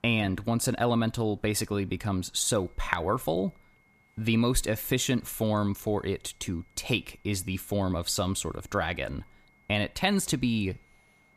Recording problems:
high-pitched whine; faint; from 2.5 s on; 2 kHz, 35 dB below the speech

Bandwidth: 14.5 kHz